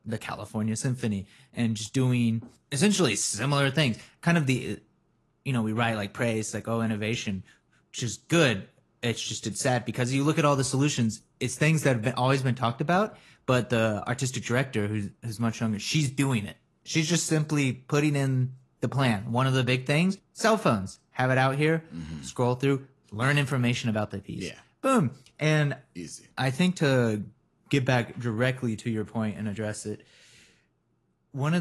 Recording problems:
garbled, watery; slightly; nothing above 11.5 kHz
abrupt cut into speech; at the end

